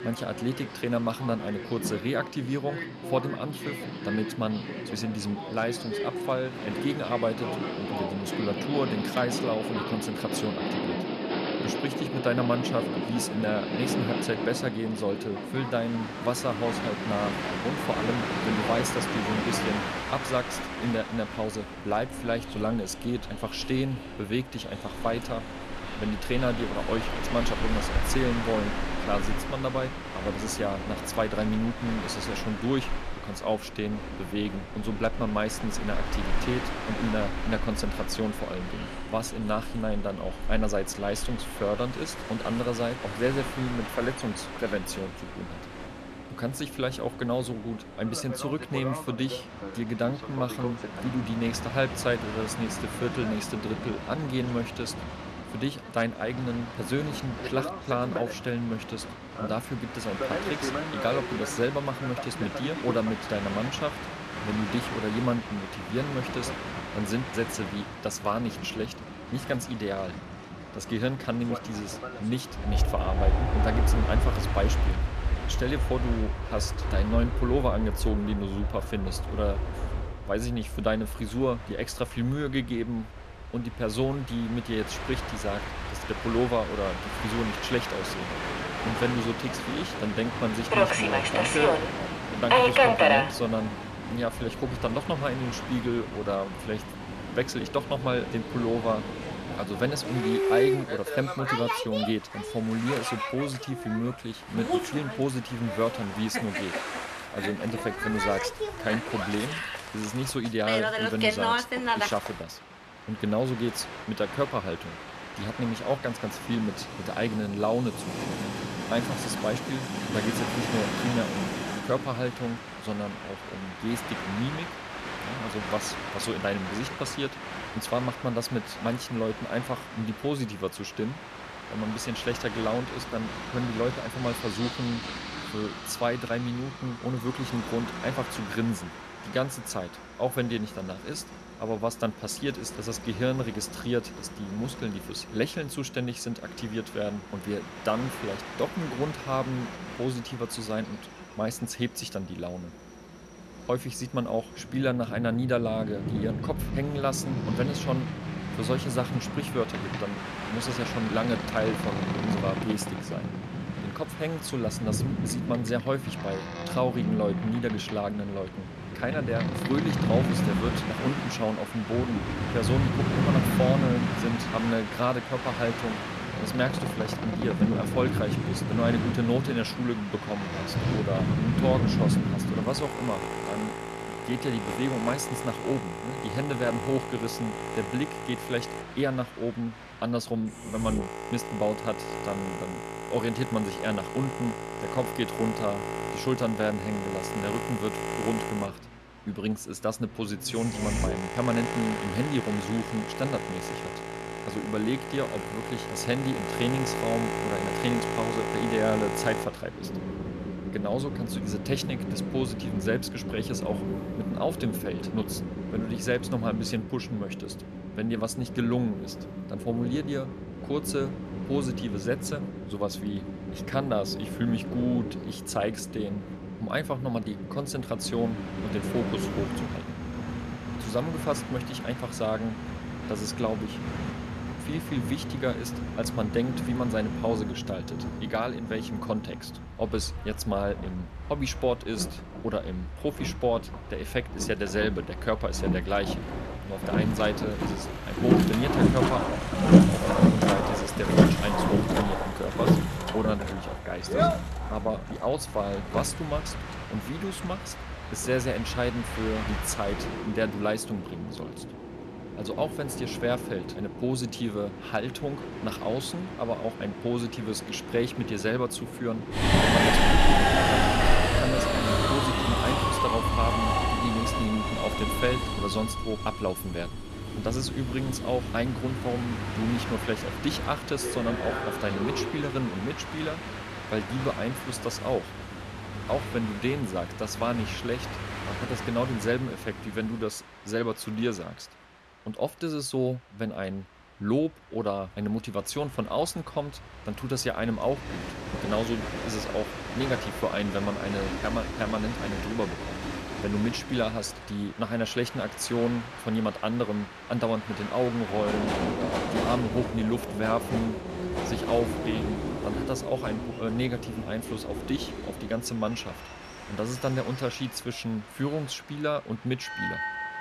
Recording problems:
train or aircraft noise; loud; throughout; 1 dB below the speech

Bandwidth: 13.5 kHz